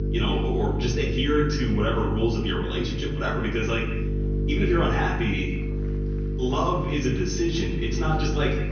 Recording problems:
off-mic speech; far
echo of what is said; noticeable; throughout; 150 ms later, 15 dB below the speech
room echo; noticeable; dies away in 0.5 s
high frequencies cut off; noticeable; nothing above 6 kHz
electrical hum; loud; throughout; 50 Hz, 9 dB below the speech
murmuring crowd; faint; throughout; 25 dB below the speech

